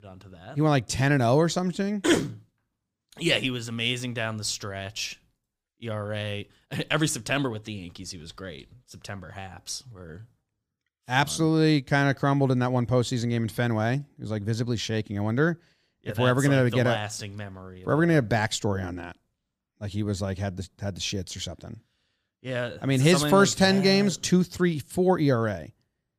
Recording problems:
none

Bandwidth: 15 kHz